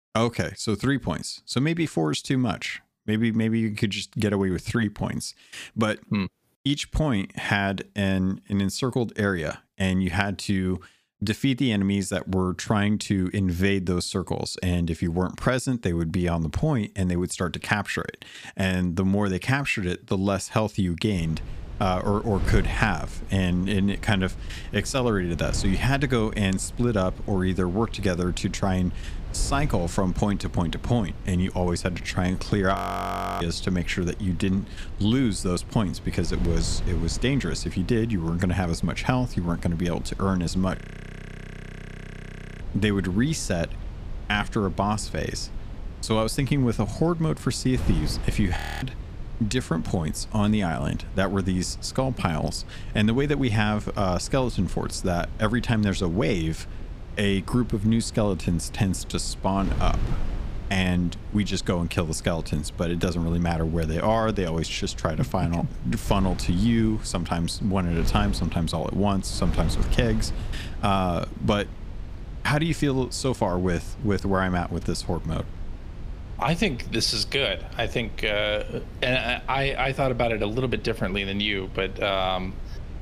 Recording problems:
wind noise on the microphone; occasional gusts; from 21 s on; 20 dB below the speech
audio freezing; at 33 s for 0.5 s, at 41 s for 2 s and at 49 s

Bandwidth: 15 kHz